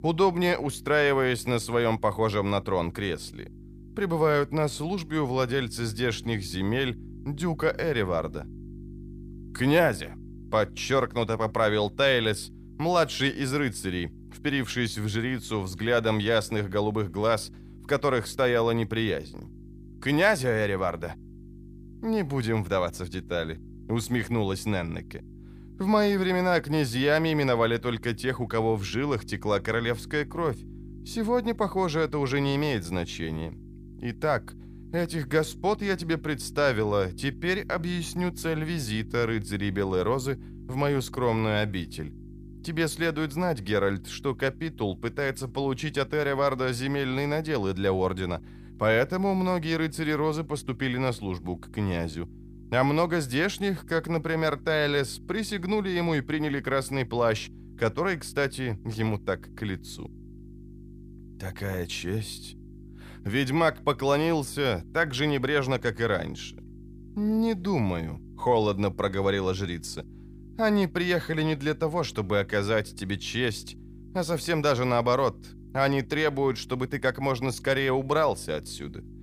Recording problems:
electrical hum; faint; throughout; 50 Hz, 25 dB below the speech

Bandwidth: 15 kHz